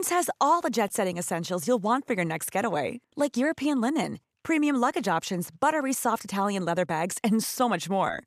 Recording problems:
abrupt cut into speech; at the start

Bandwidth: 14.5 kHz